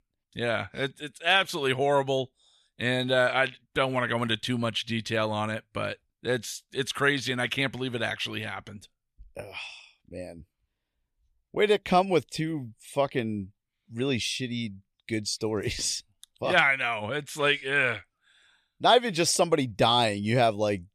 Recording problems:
none

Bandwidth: 14 kHz